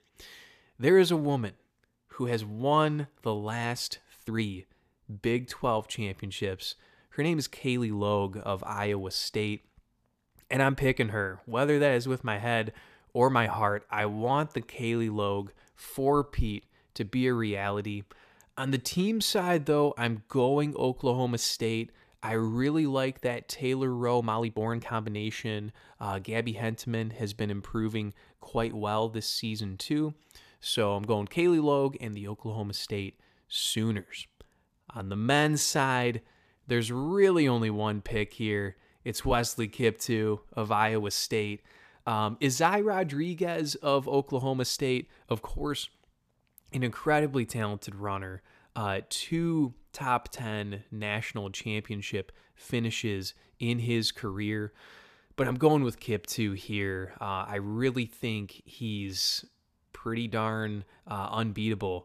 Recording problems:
uneven, jittery; strongly; from 4 s to 1:01

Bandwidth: 14.5 kHz